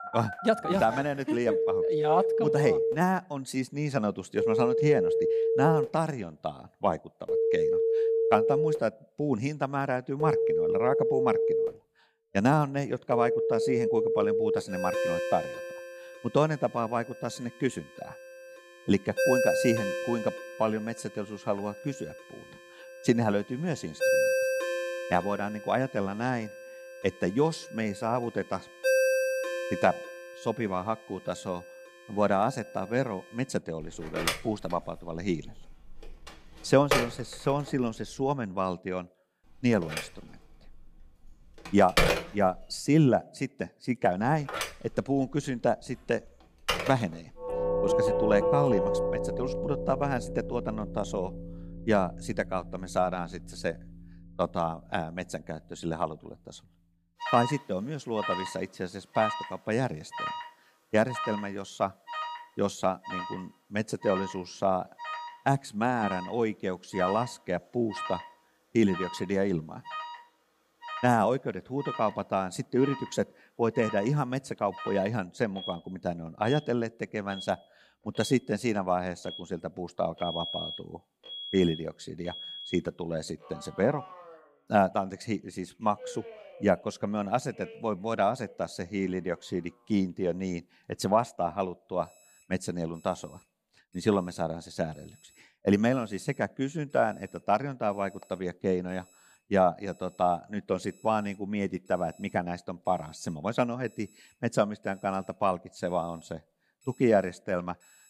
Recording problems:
alarms or sirens; loud; throughout; 1 dB below the speech

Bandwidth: 15 kHz